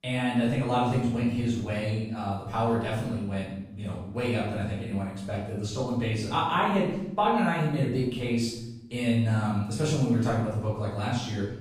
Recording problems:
off-mic speech; far
room echo; noticeable; dies away in 0.8 s

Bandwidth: 15 kHz